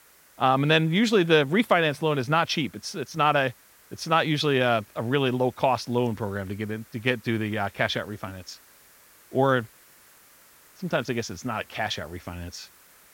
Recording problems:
hiss; faint; throughout; 30 dB below the speech

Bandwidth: 16.5 kHz